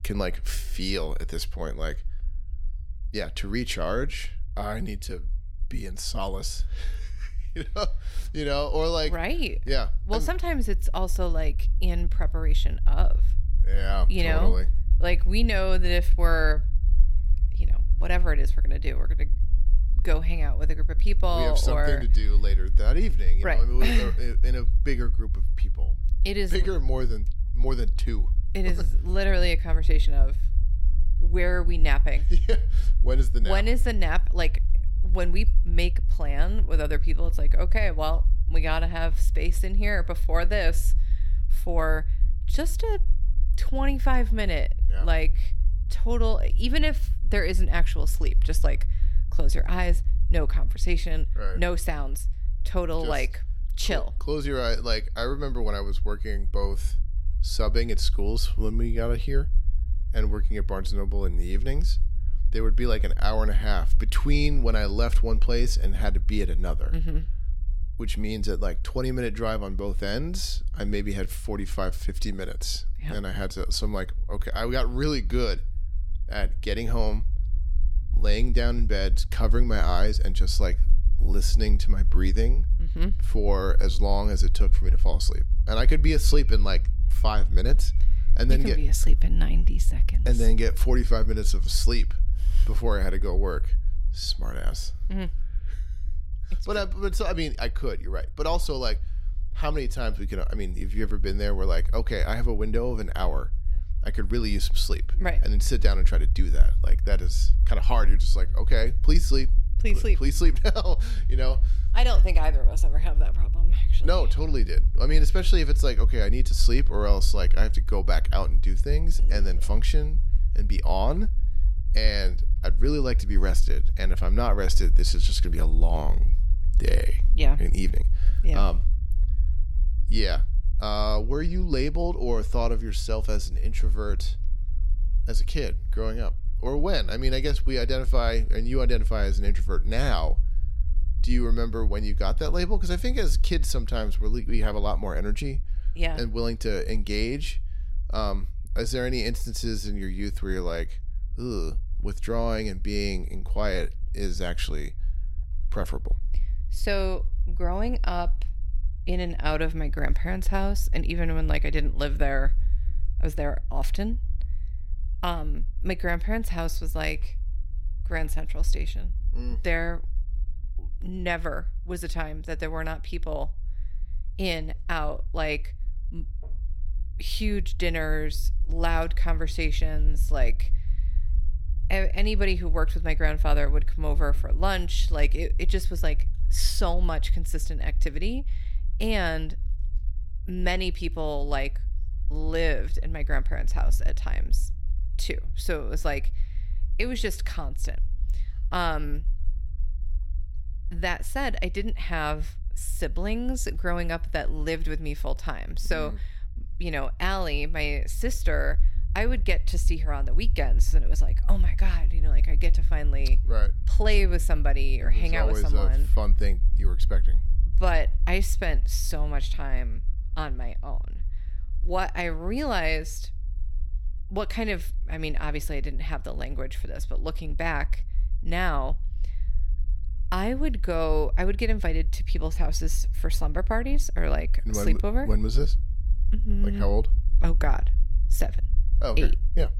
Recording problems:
low rumble; faint; throughout; 20 dB below the speech

